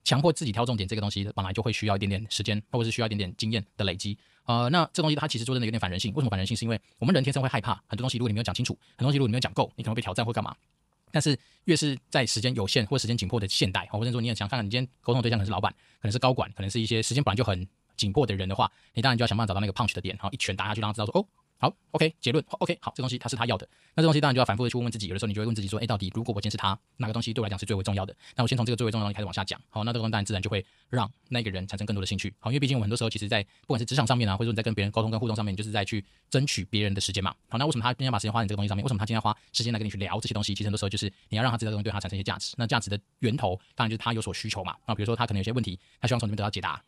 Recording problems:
wrong speed, natural pitch; too fast; 1.7 times normal speed

